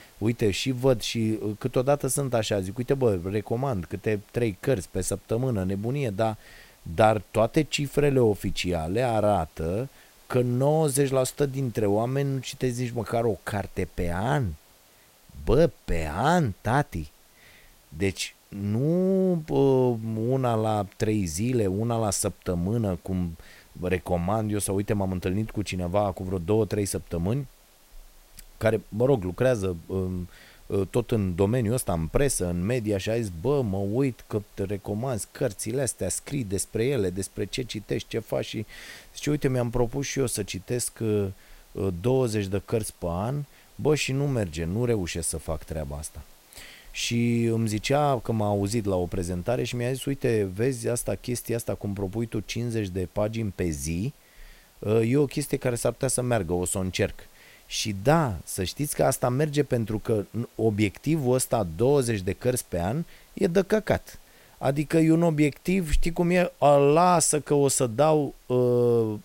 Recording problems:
hiss; faint; throughout; 30 dB below the speech

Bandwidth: 16 kHz